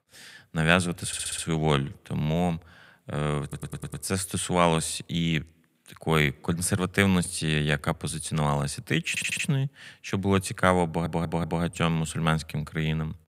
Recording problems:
audio stuttering; 4 times, first at 1 s

